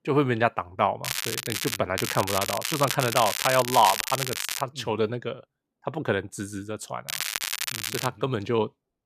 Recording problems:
crackling; loud; at 1 s, from 2 to 4.5 s and from 7 to 8 s; 2 dB below the speech

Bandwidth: 14.5 kHz